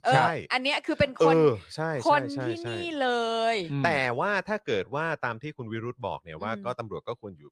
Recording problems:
none

